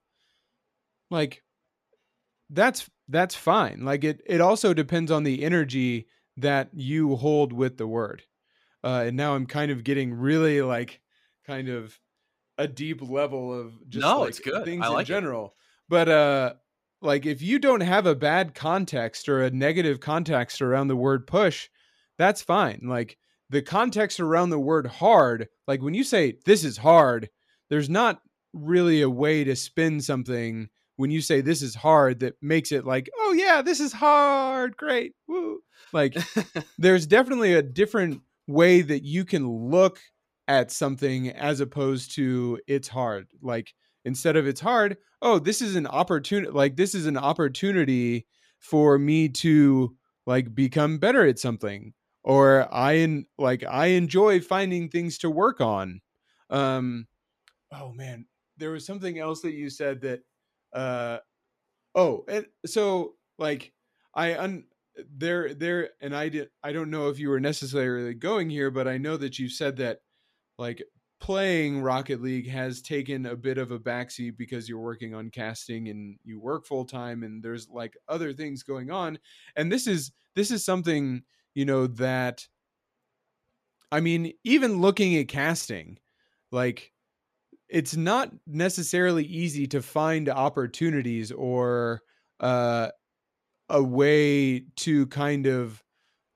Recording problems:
none

